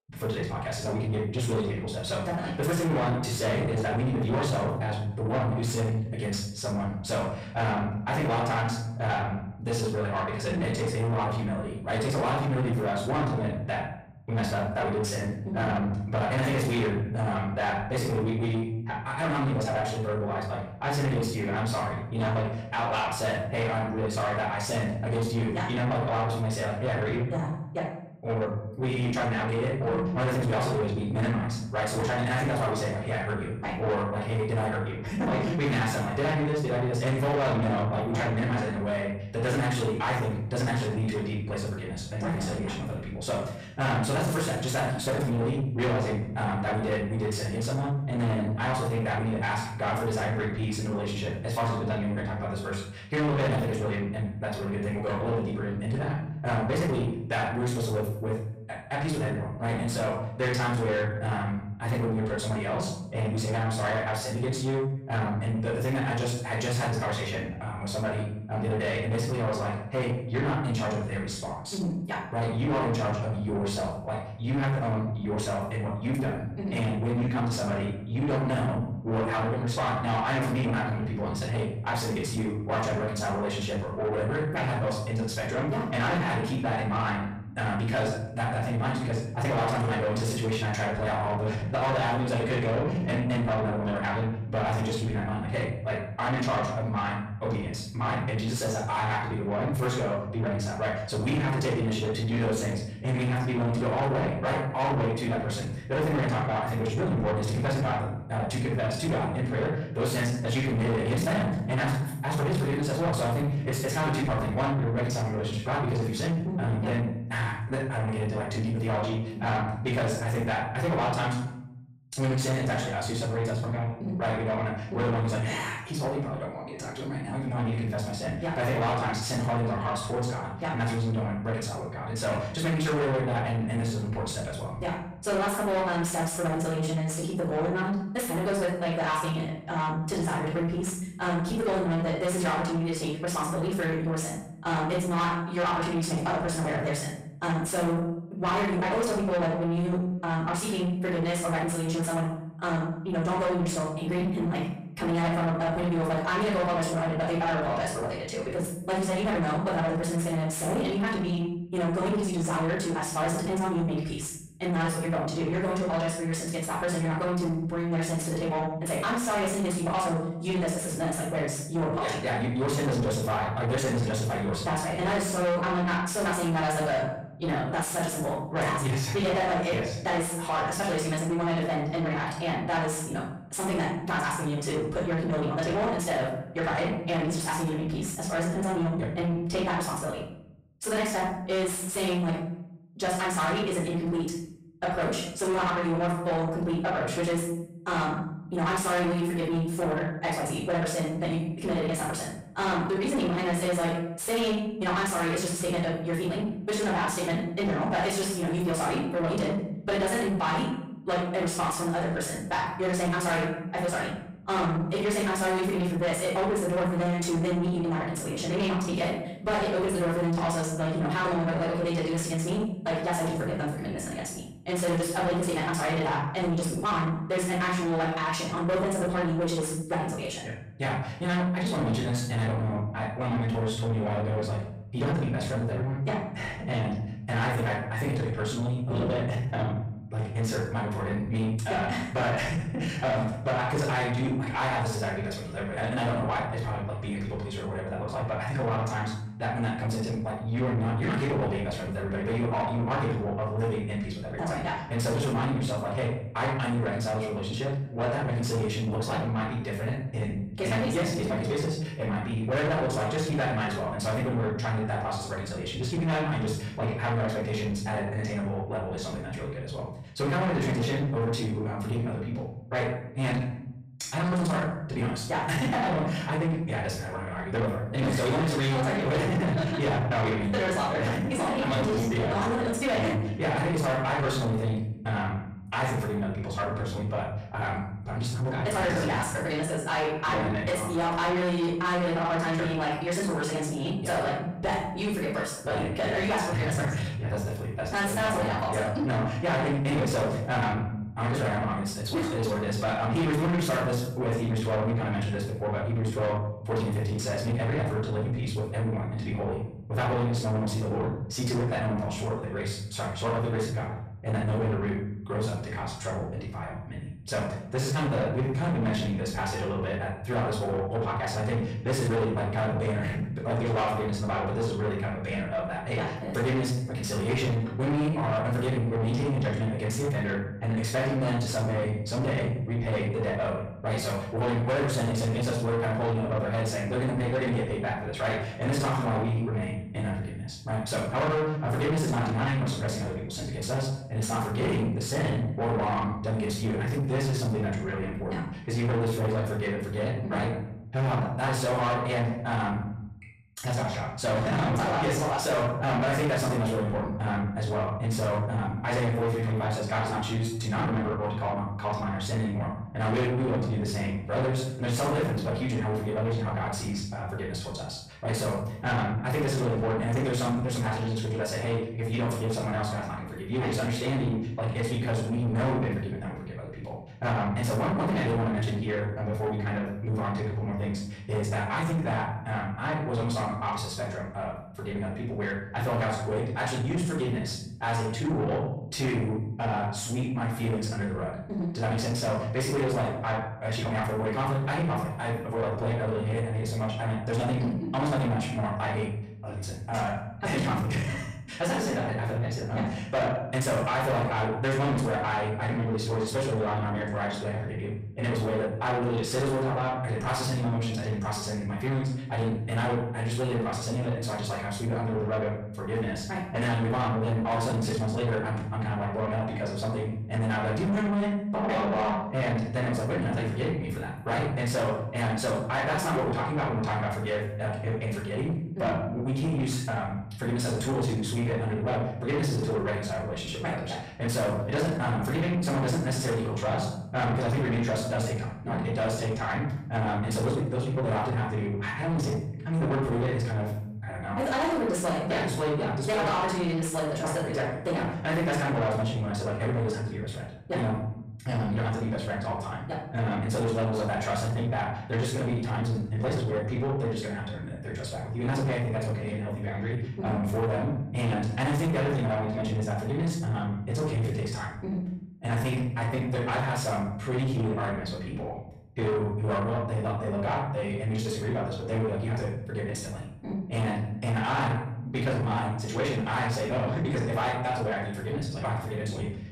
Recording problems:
distortion; heavy; 8 dB below the speech
off-mic speech; far
wrong speed, natural pitch; too fast; 1.6 times normal speed
room echo; noticeable; dies away in 0.6 s

